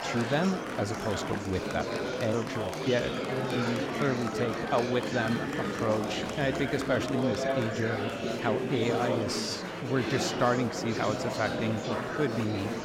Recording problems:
murmuring crowd; loud; throughout; 1 dB below the speech

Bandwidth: 16.5 kHz